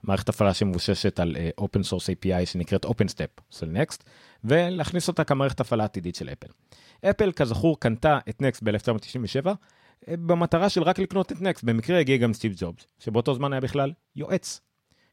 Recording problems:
none

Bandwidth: 16 kHz